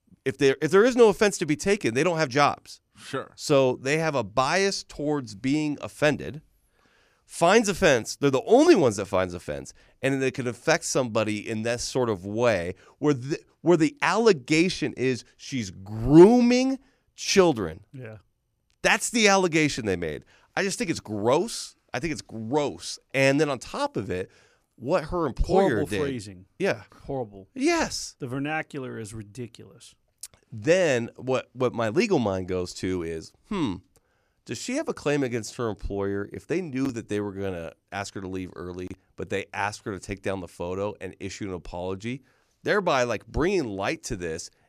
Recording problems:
none

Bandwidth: 15 kHz